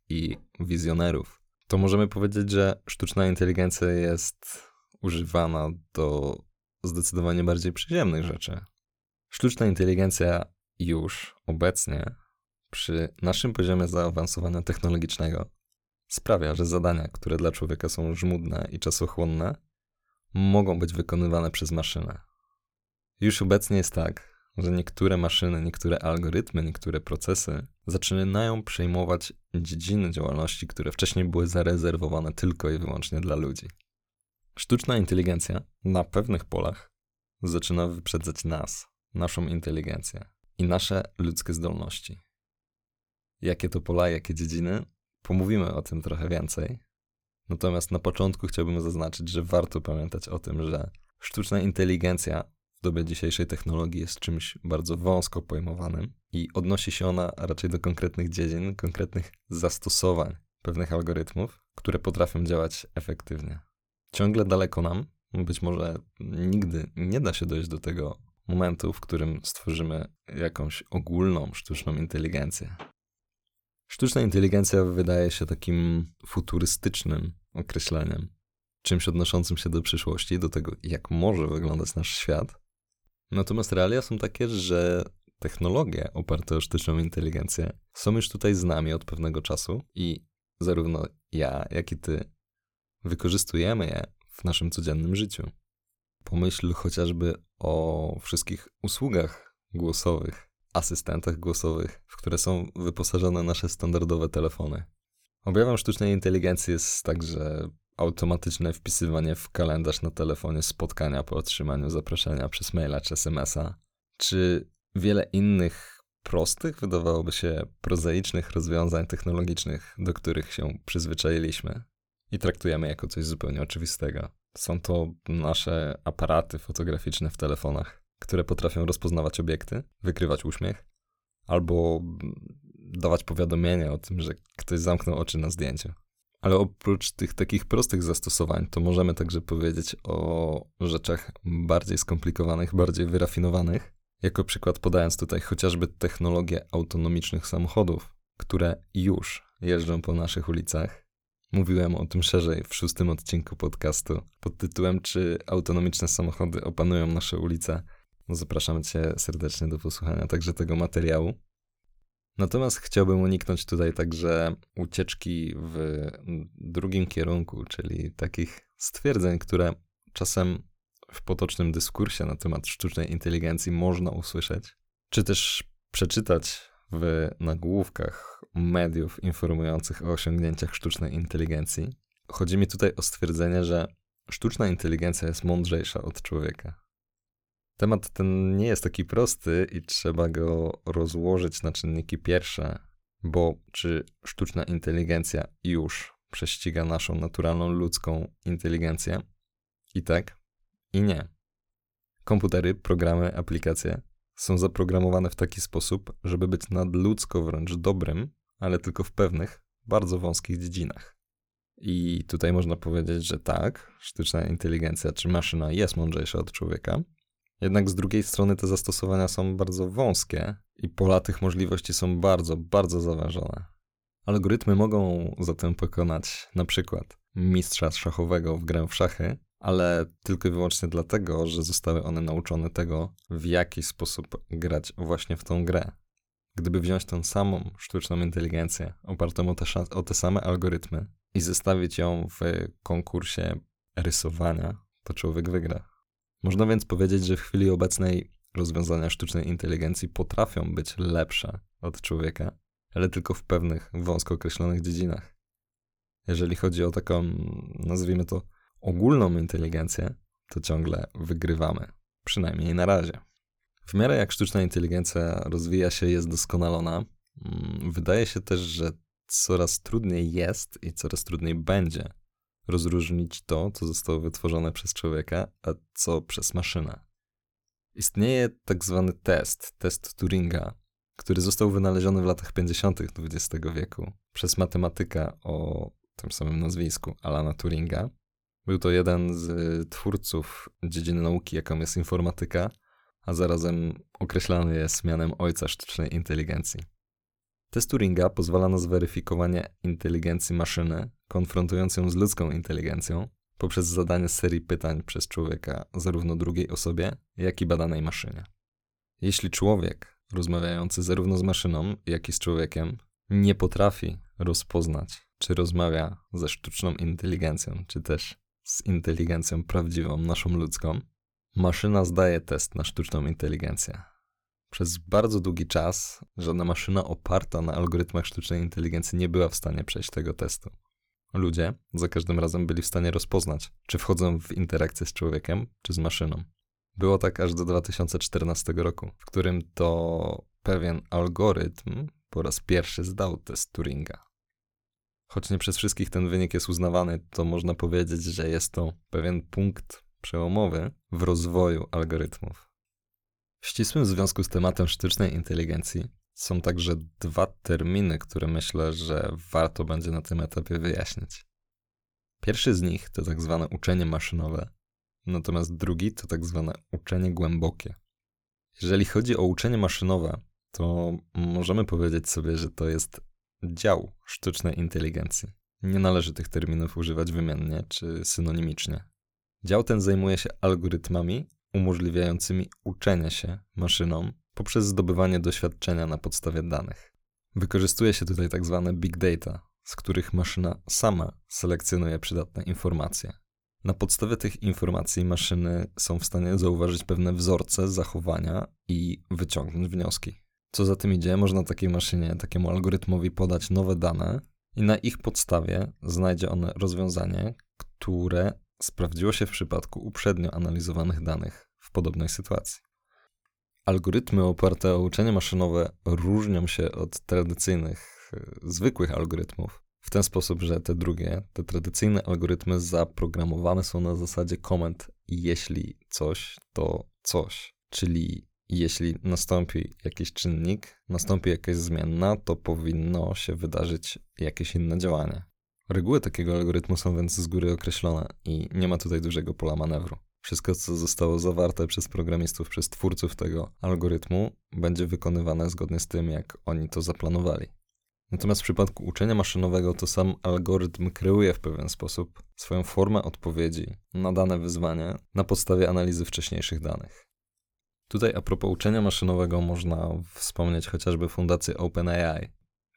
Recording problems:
none

